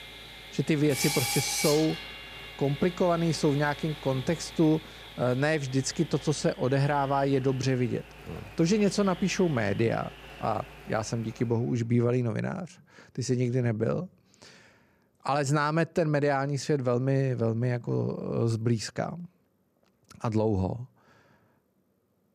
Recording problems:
machinery noise; loud; until 12 s; 10 dB below the speech

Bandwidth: 14.5 kHz